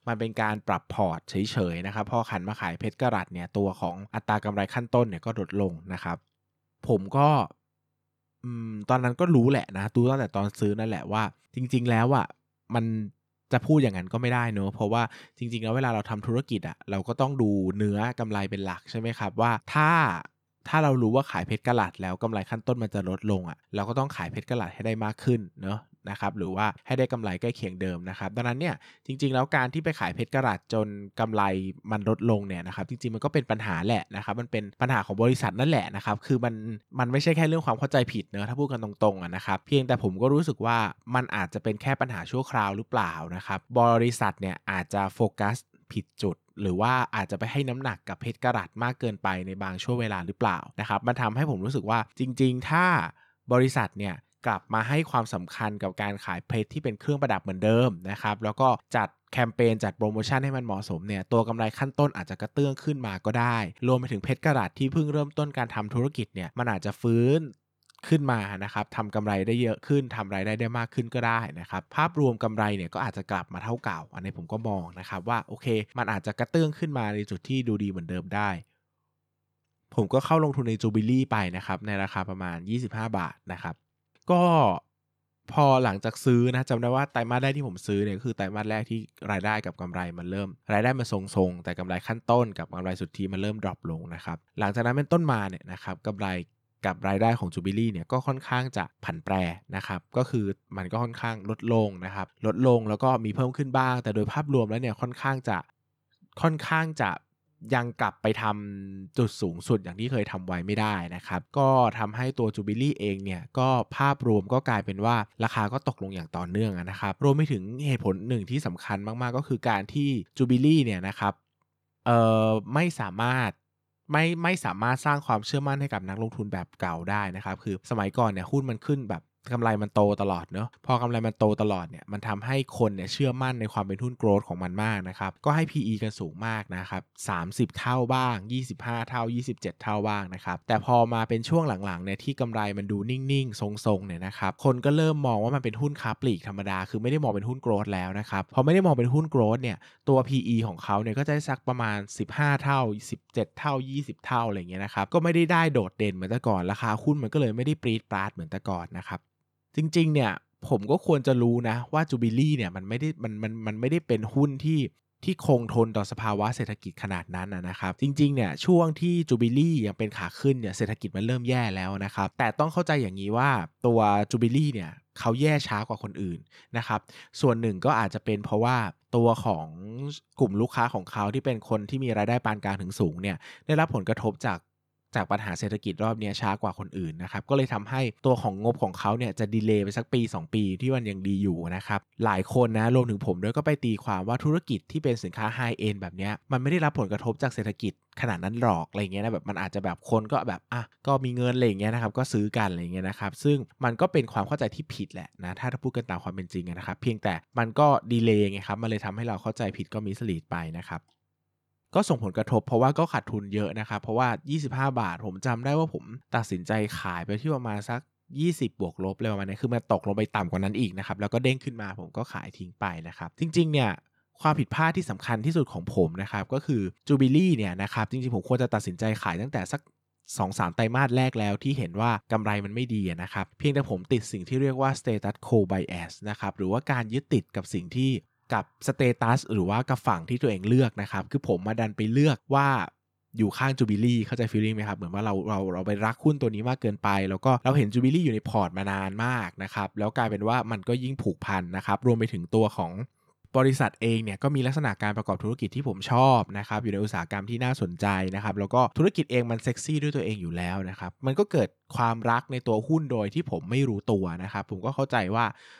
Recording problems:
none

